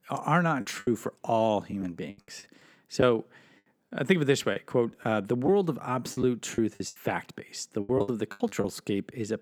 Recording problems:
choppy; very; 10% of the speech affected

